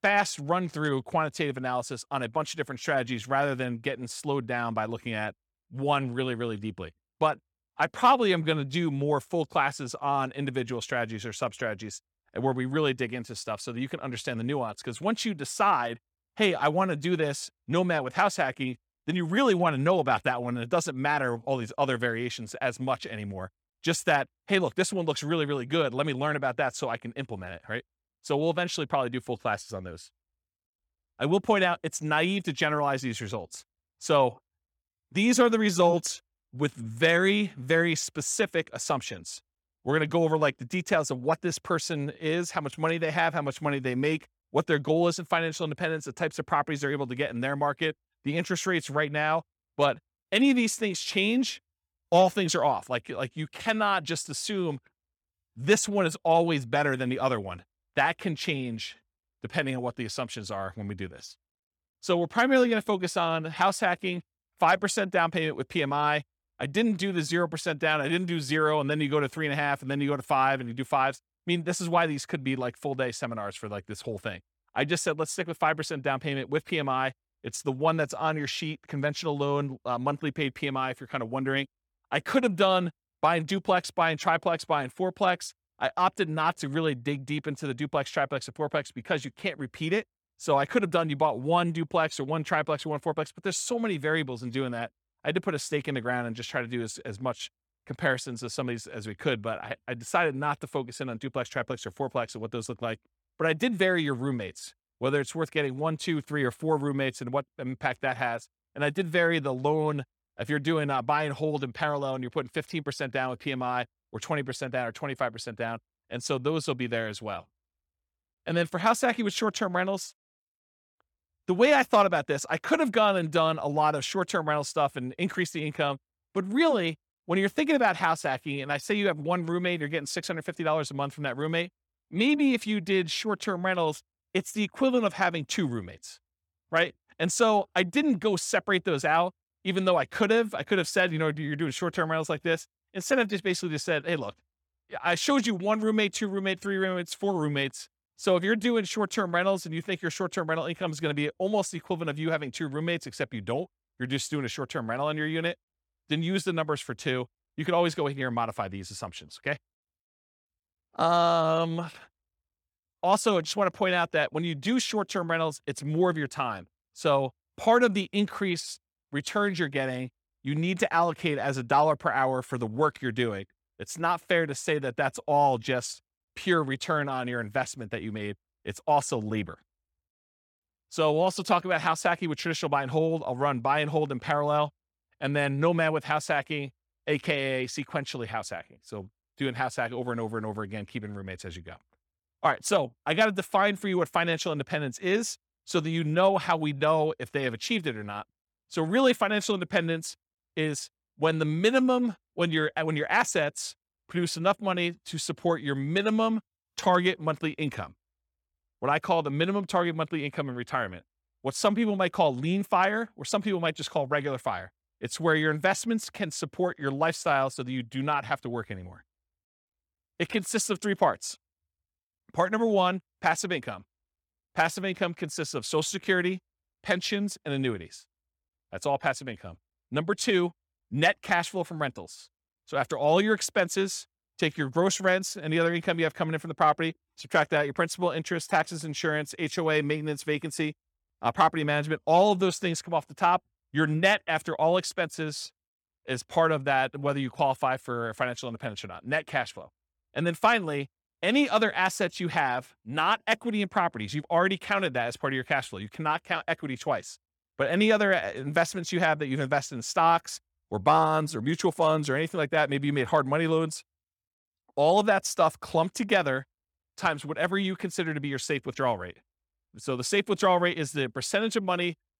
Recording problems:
none

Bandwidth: 18 kHz